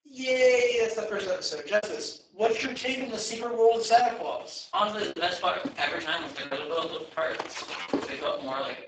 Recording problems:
off-mic speech; far
garbled, watery; badly; nothing above 8 kHz
thin; somewhat; fading below 550 Hz
room echo; slight; dies away in 0.4 s
choppy; occasionally; 4% of the speech affected
footsteps; noticeable; from 5 to 8 s; peak 3 dB below the speech

